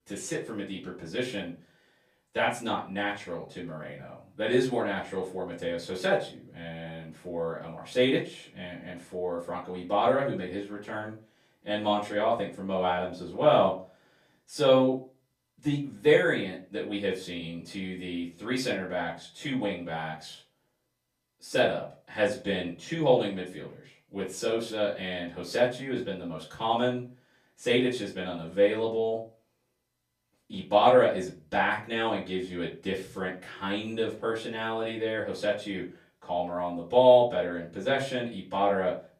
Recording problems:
off-mic speech; far
room echo; slight; dies away in 0.3 s

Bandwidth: 14.5 kHz